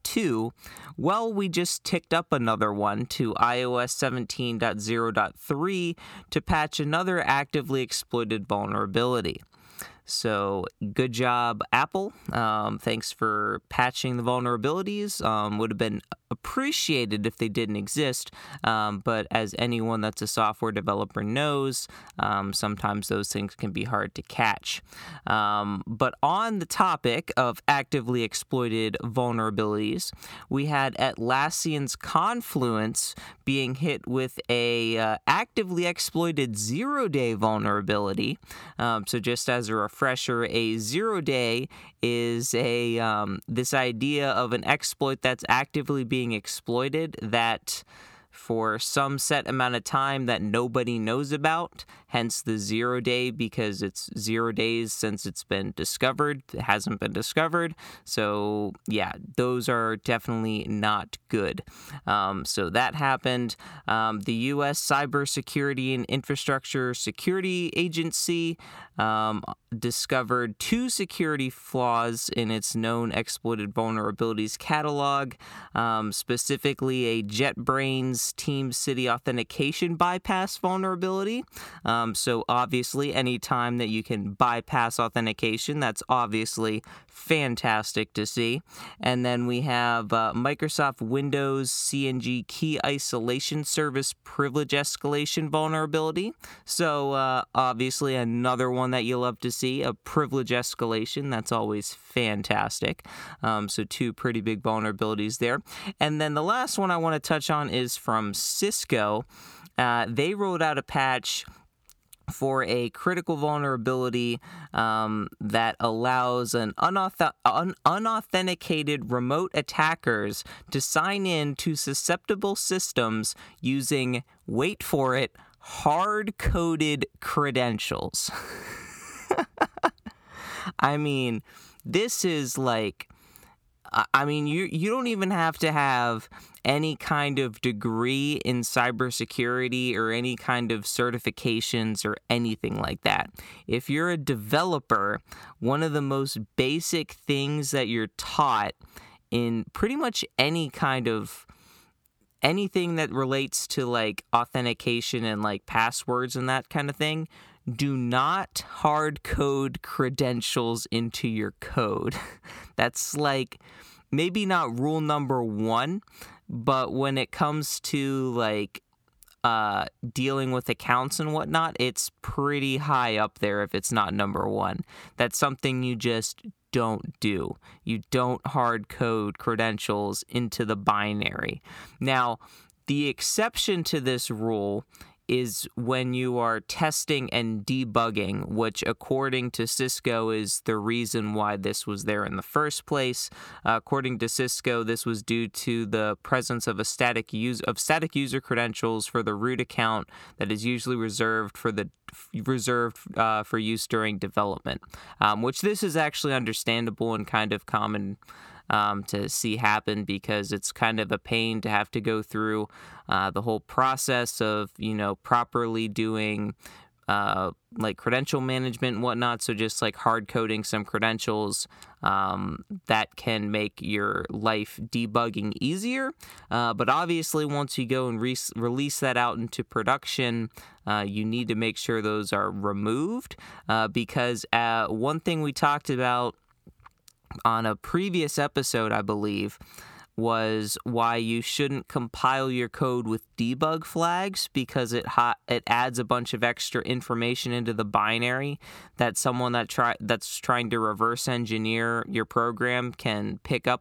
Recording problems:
none

